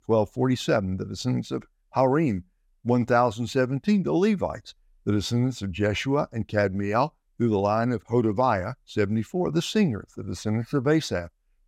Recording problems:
none

